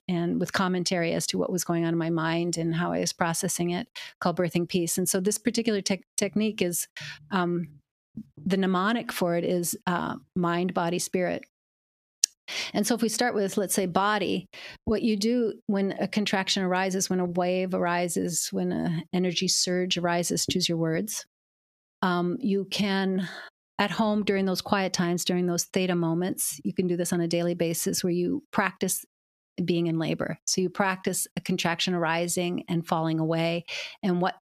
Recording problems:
squashed, flat; somewhat

